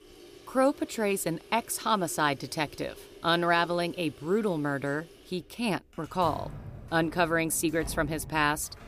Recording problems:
household noises; noticeable; throughout; 20 dB below the speech

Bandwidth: 15 kHz